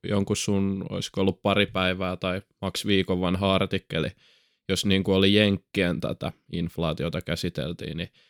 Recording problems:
none

